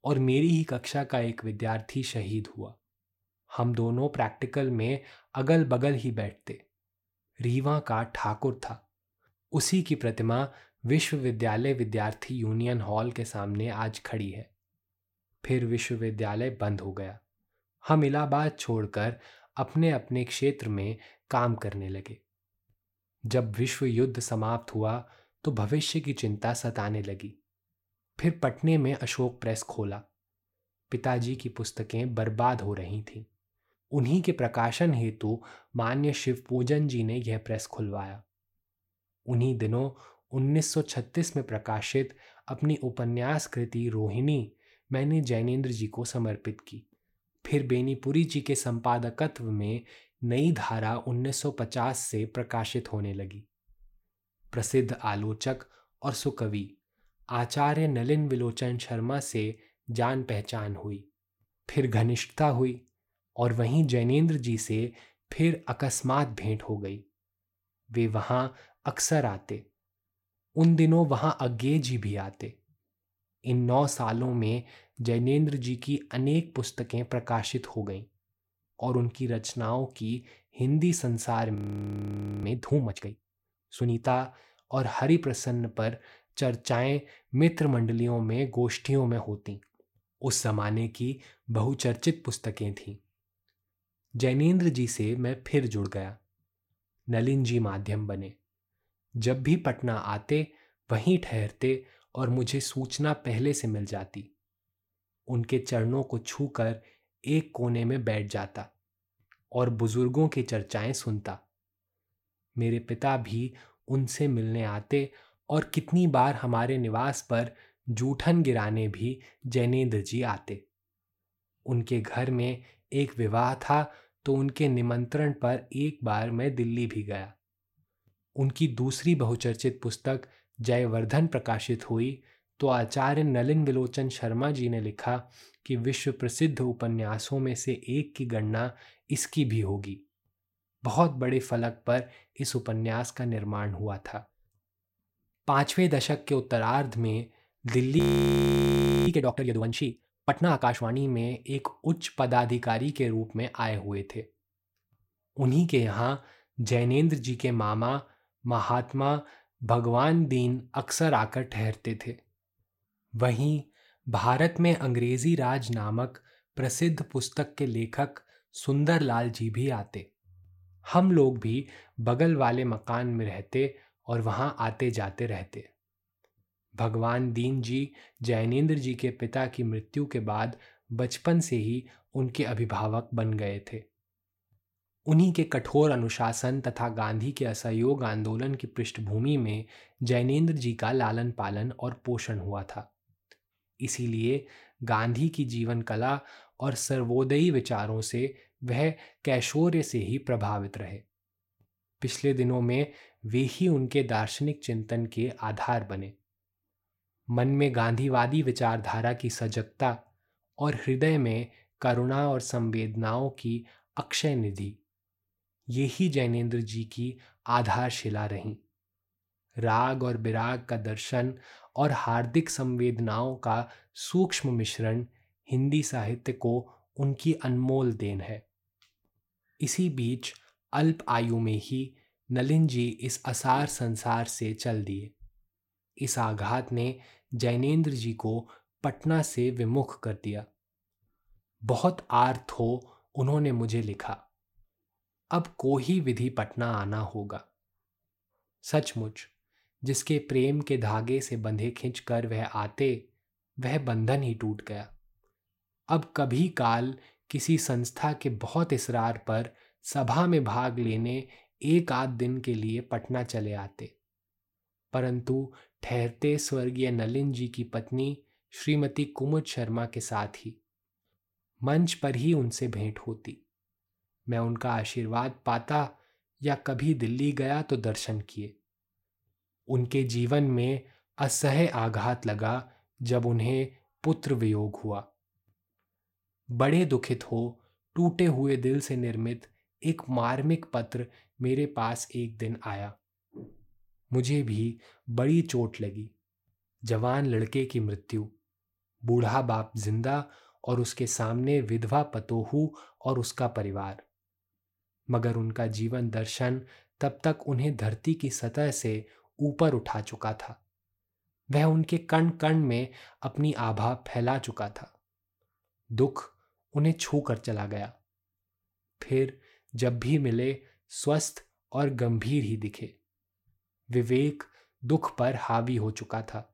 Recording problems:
audio freezing; at 1:22 for 1 s and at 2:28 for 1 s

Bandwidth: 16.5 kHz